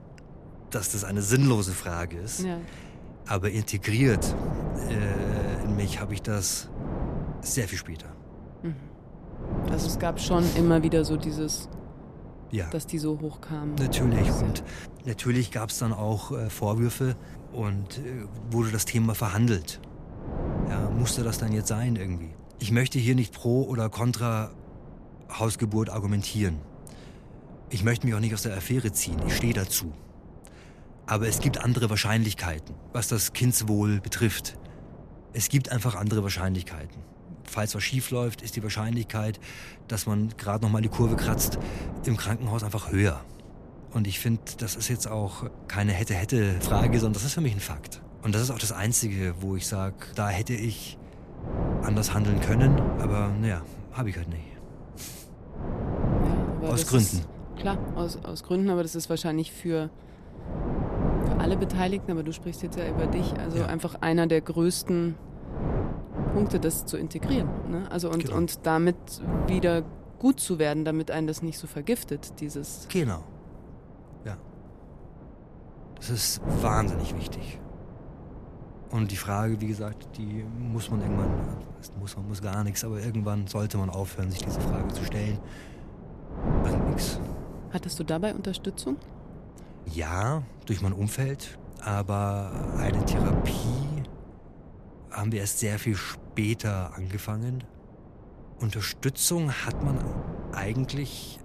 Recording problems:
wind noise on the microphone; heavy; 8 dB below the speech

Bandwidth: 14.5 kHz